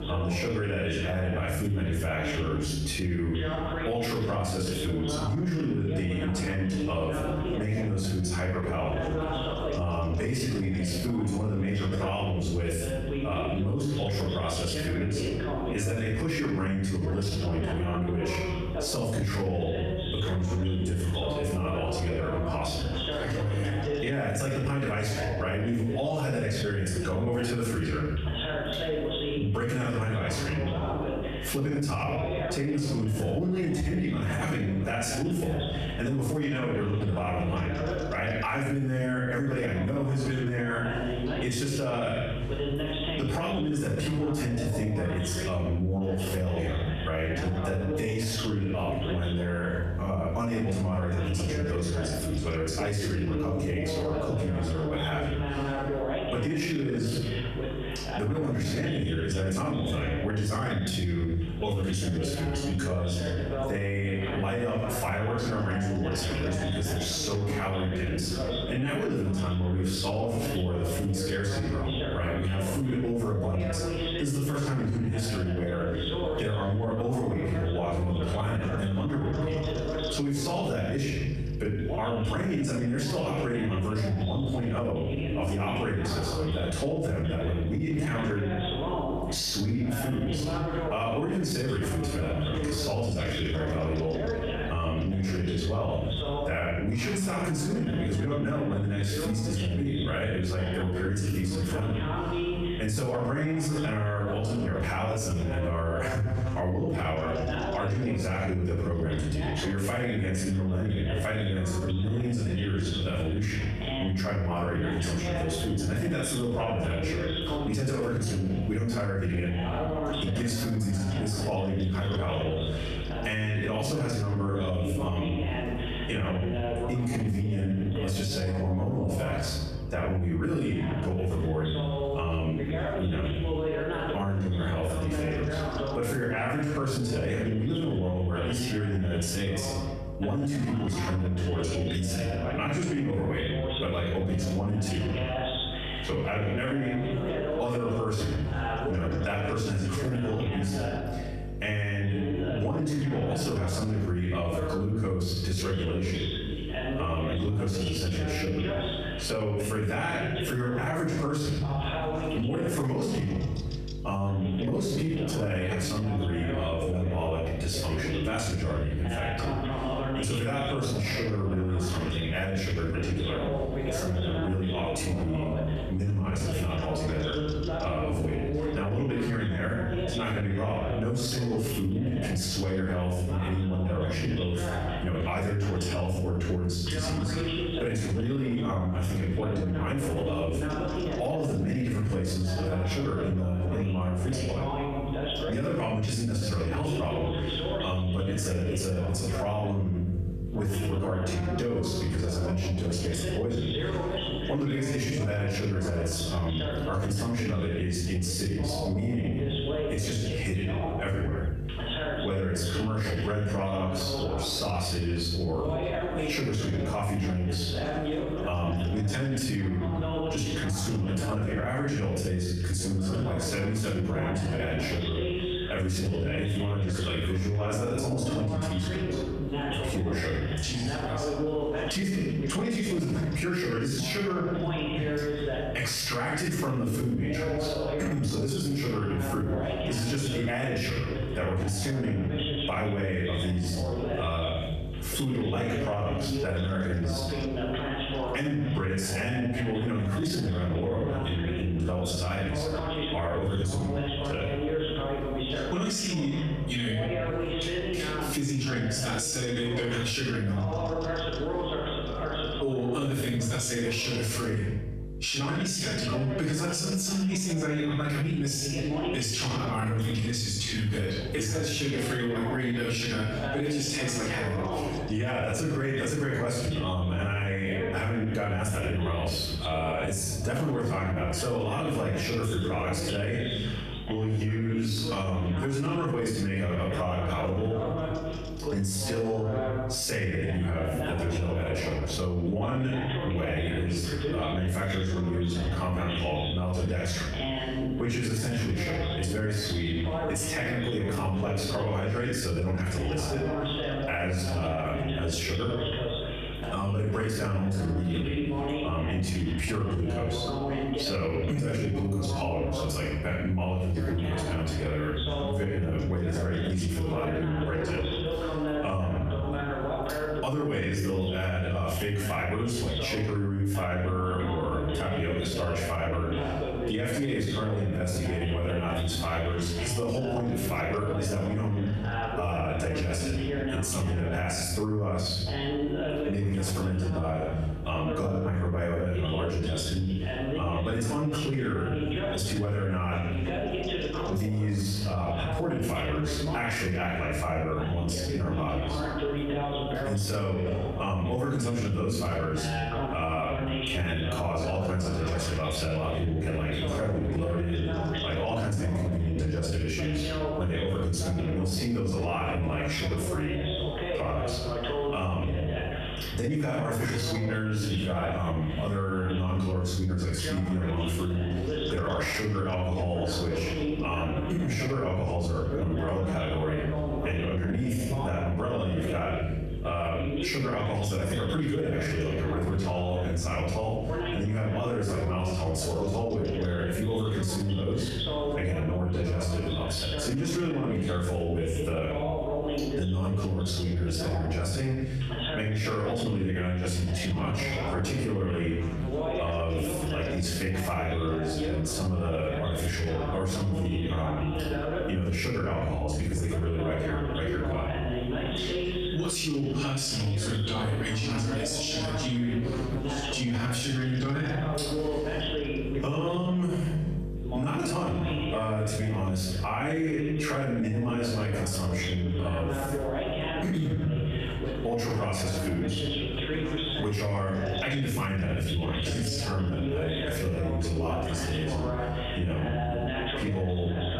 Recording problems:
off-mic speech; far
squashed, flat; heavily, background pumping
room echo; noticeable; dies away in 0.7 s
voice in the background; loud; throughout; 6 dB below the speech
electrical hum; noticeable; throughout; 50 Hz, 20 dB below the speech

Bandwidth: 14.5 kHz